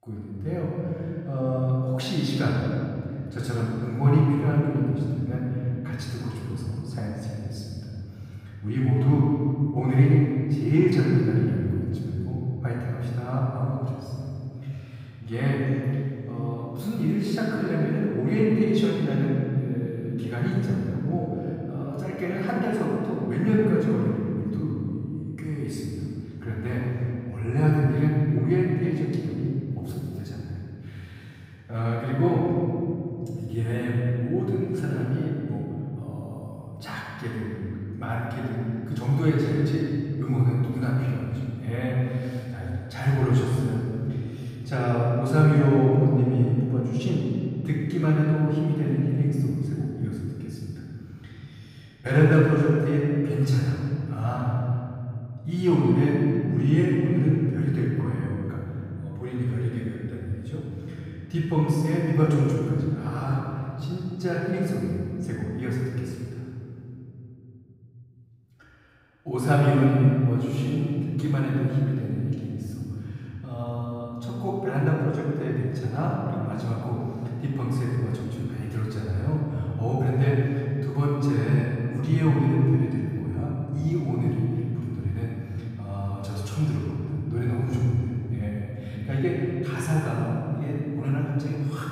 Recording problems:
room echo; strong; dies away in 3 s
off-mic speech; far

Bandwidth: 15.5 kHz